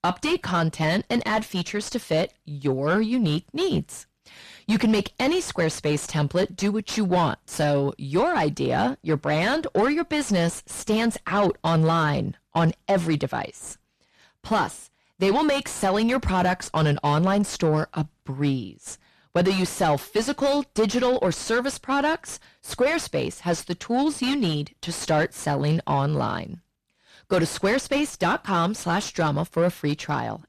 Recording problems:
distortion; heavy; 6 dB below the speech

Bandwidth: 14 kHz